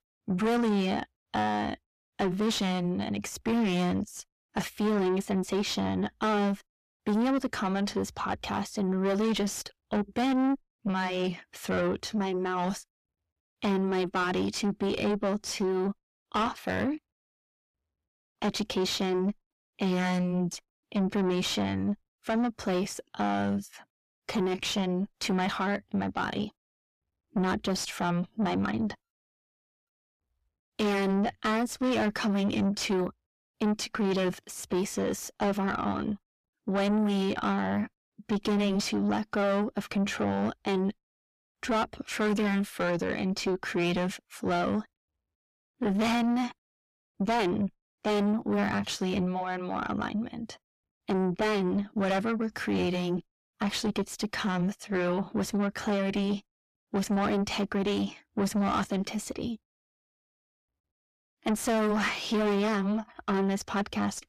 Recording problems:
distortion; heavy; 6 dB below the speech

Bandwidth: 14.5 kHz